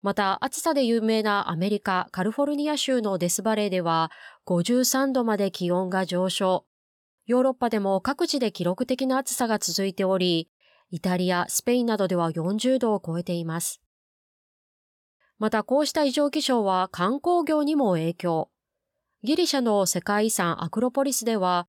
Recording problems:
none

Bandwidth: 17 kHz